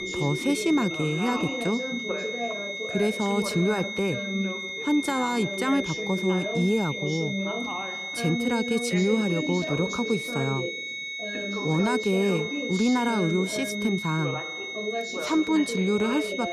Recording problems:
high-pitched whine; loud; throughout; 2 kHz, 5 dB below the speech
background chatter; loud; throughout; 2 voices, 7 dB below the speech

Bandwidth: 14 kHz